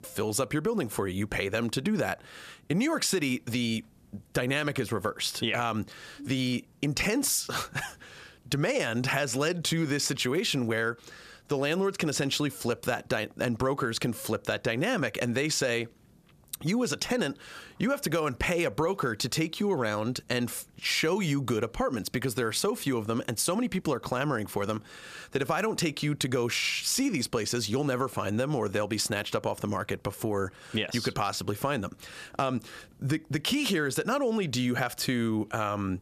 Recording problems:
squashed, flat; heavily

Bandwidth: 14.5 kHz